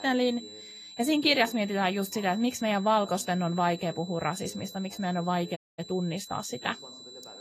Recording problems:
garbled, watery; slightly; nothing above 14.5 kHz
high-pitched whine; noticeable; throughout; 4 kHz, 15 dB below the speech
voice in the background; faint; throughout; 25 dB below the speech
audio cutting out; at 5.5 s

